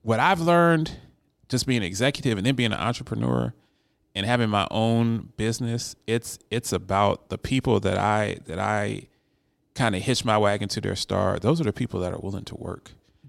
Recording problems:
none

